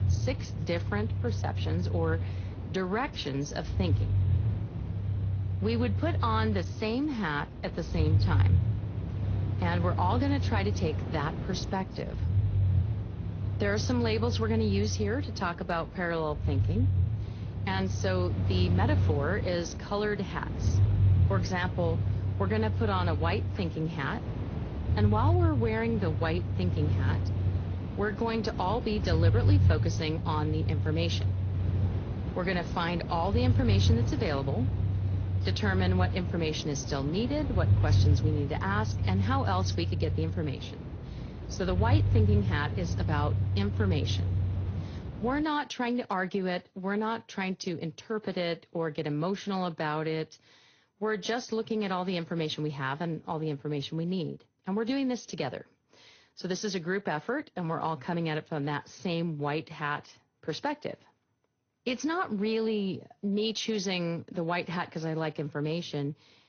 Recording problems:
garbled, watery; slightly; nothing above 6.5 kHz
low rumble; noticeable; until 45 s; 10 dB below the speech

